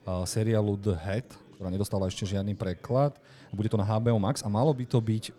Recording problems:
chatter from many people; faint; throughout; 25 dB below the speech
uneven, jittery; strongly; from 1 to 4.5 s

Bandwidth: 18.5 kHz